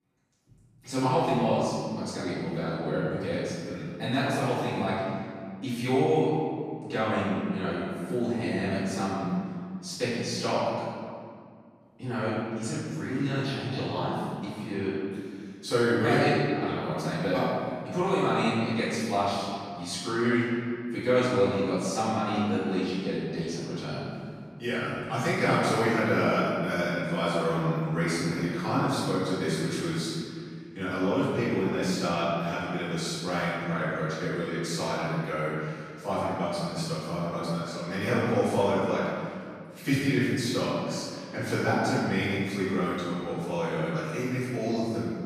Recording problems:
room echo; strong; dies away in 2 s
off-mic speech; far

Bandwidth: 14.5 kHz